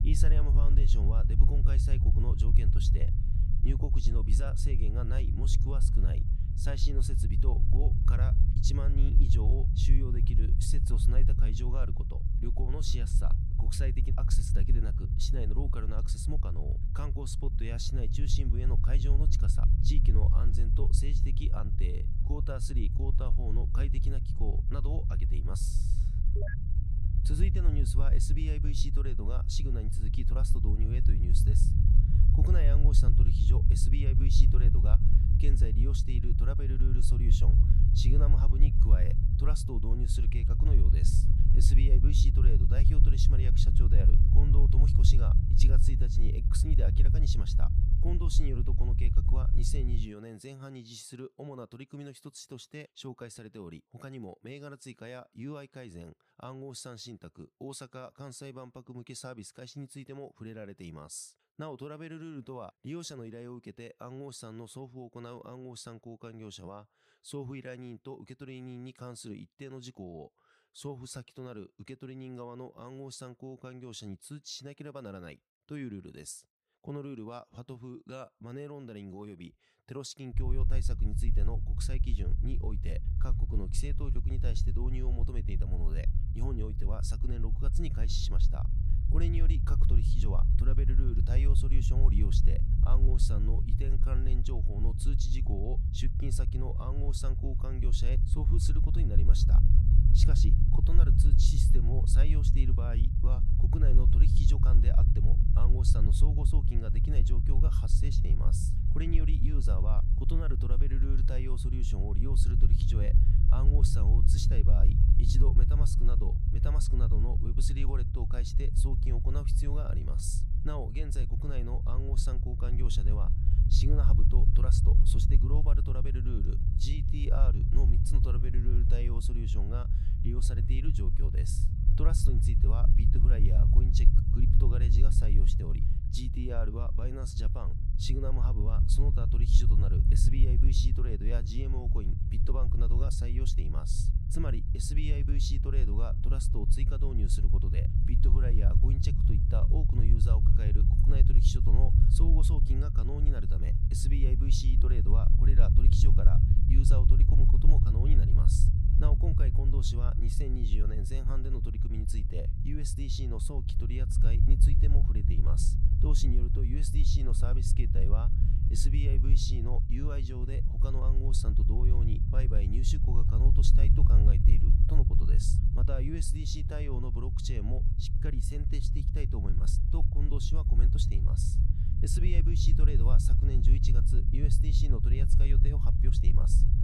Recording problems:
low rumble; loud; until 50 s and from 1:20 on; 2 dB below the speech

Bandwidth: 15 kHz